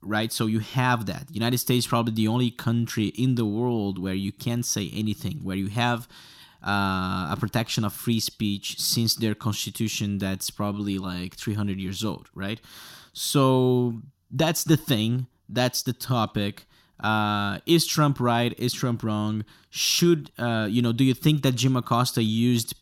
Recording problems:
none

